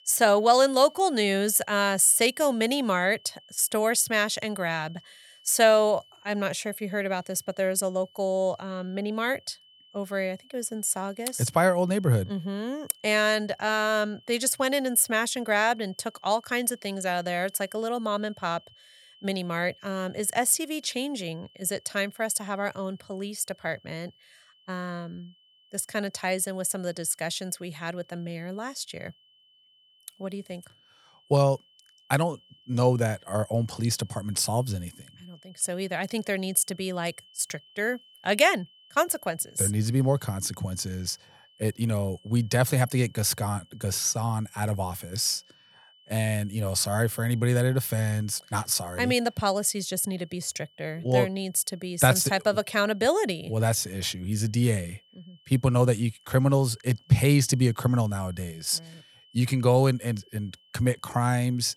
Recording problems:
high-pitched whine; faint; throughout; 3 kHz, 30 dB below the speech

